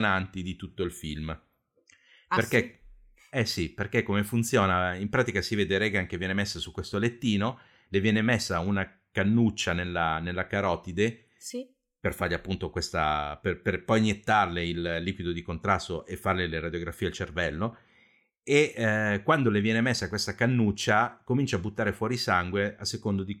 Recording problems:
abrupt cut into speech; at the start

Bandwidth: 17 kHz